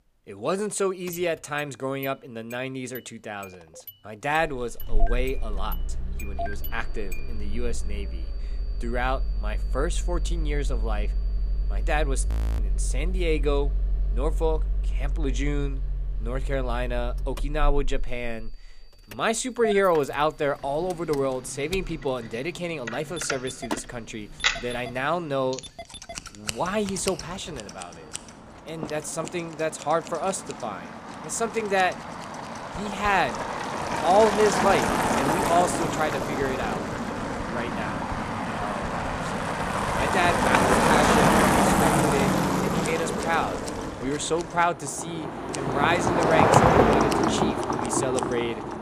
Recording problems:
traffic noise; very loud; throughout; 2 dB above the speech
household noises; noticeable; from 21 s on; 10 dB below the speech
high-pitched whine; faint; from 6.5 to 12 s, from 18 to 28 s and from 32 to 42 s; 4.5 kHz, 30 dB below the speech
audio freezing; at 12 s

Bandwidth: 15 kHz